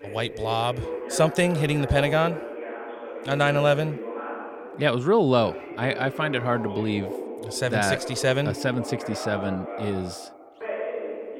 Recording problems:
voice in the background; loud; throughout; 9 dB below the speech

